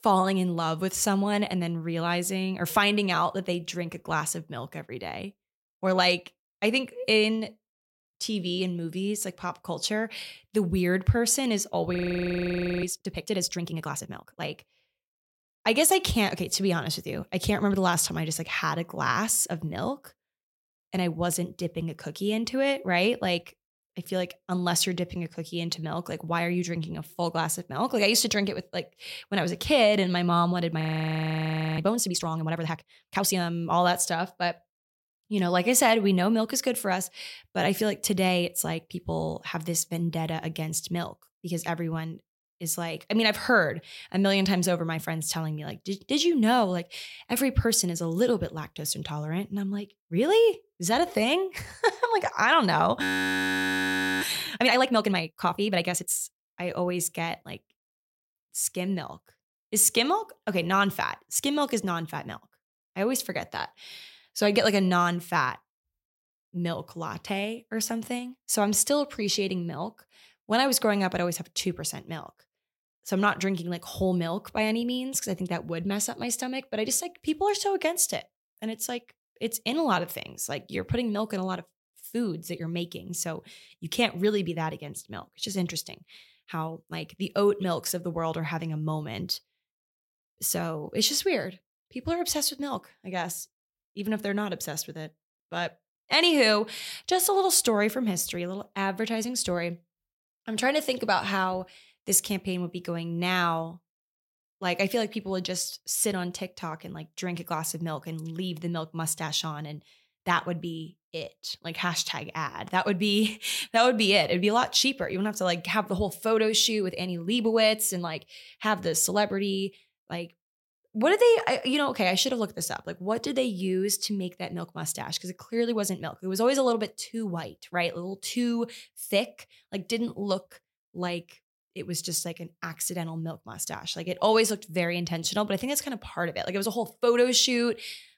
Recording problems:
audio freezing; at 12 s for 1 s, at 31 s for 1 s and at 53 s for 1 s

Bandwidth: 16.5 kHz